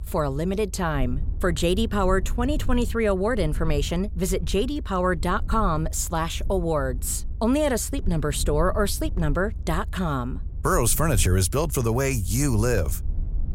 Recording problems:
low rumble; faint; throughout; 25 dB below the speech

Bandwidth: 16 kHz